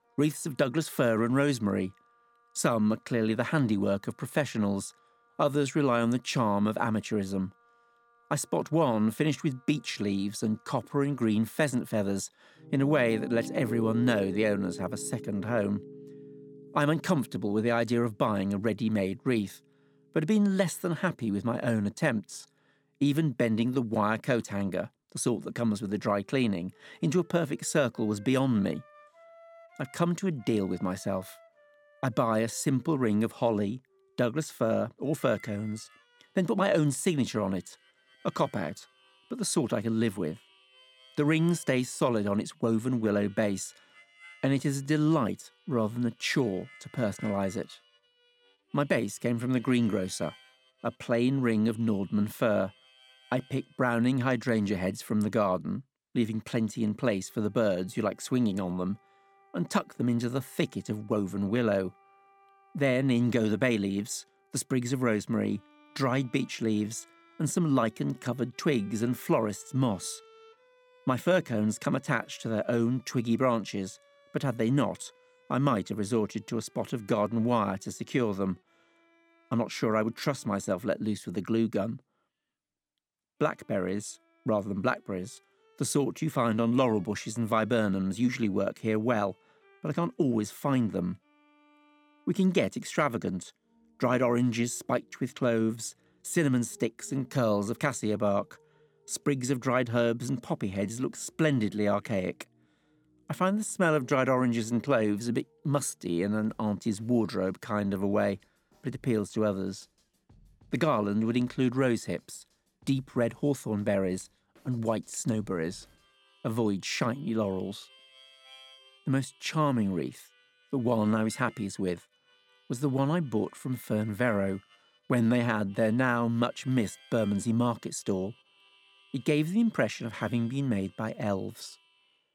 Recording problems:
background music; faint; throughout; 25 dB below the speech

